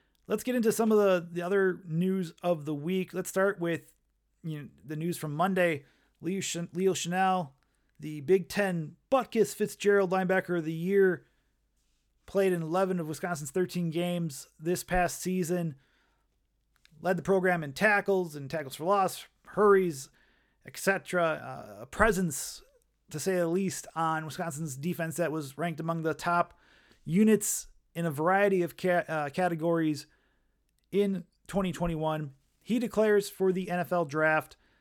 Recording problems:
none

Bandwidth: 18.5 kHz